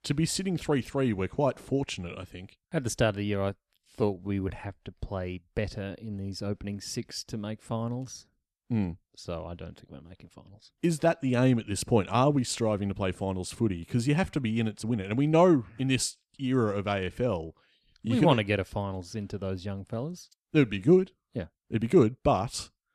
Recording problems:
uneven, jittery; strongly; from 3.5 to 22 s

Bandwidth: 13.5 kHz